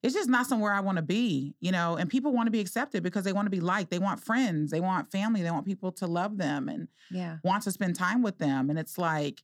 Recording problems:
none

